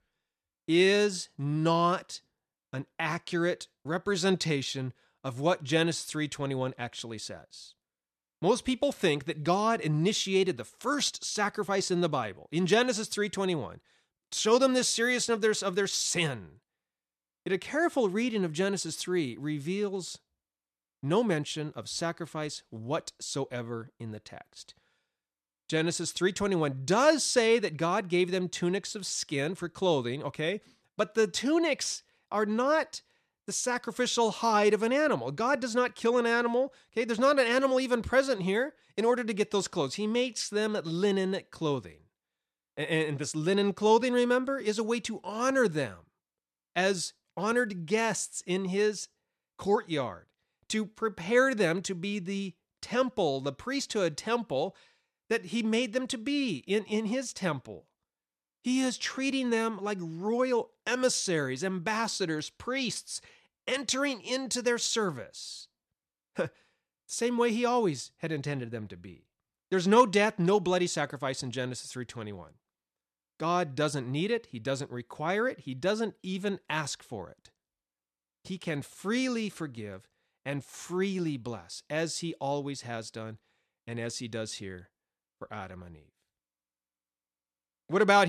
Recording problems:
abrupt cut into speech; at the end

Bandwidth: 13.5 kHz